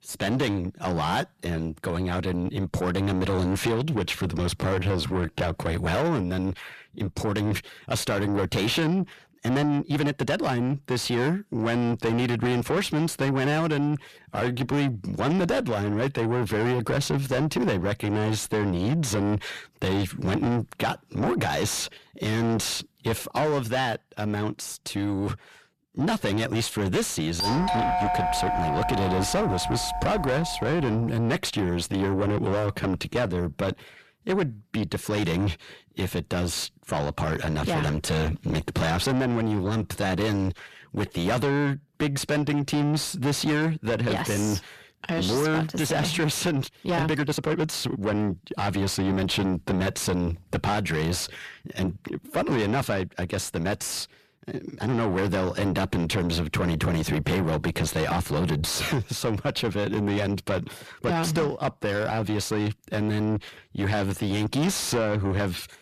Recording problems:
distortion; heavy; 6 dB below the speech
uneven, jittery; strongly; from 4.5 s to 1:02
doorbell; loud; from 27 to 31 s; peak 3 dB above the speech

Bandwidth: 14.5 kHz